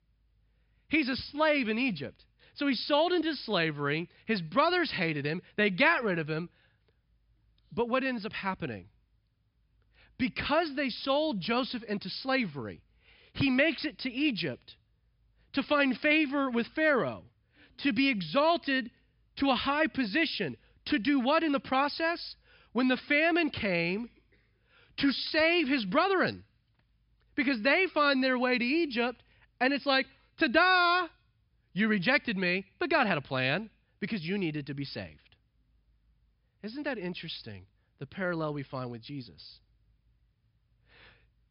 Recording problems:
high frequencies cut off; noticeable; nothing above 5.5 kHz

